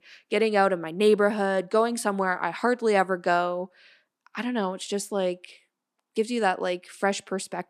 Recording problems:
none

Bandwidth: 14.5 kHz